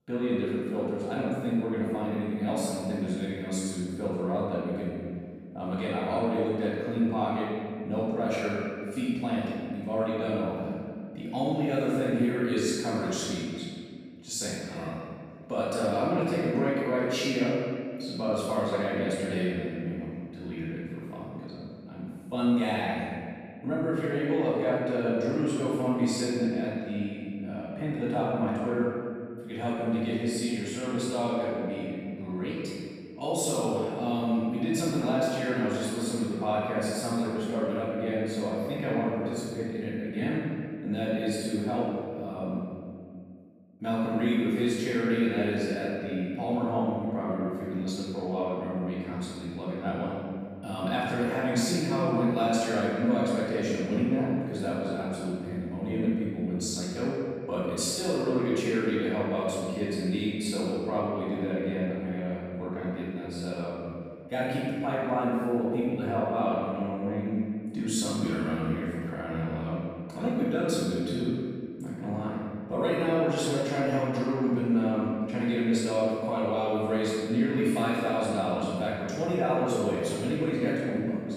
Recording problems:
room echo; strong; dies away in 2 s
off-mic speech; far

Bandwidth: 15 kHz